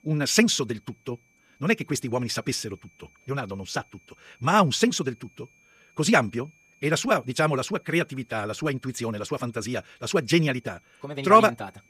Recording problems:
wrong speed, natural pitch; too fast; 1.6 times normal speed
high-pitched whine; faint; throughout; 2.5 kHz, 35 dB below the speech

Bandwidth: 15 kHz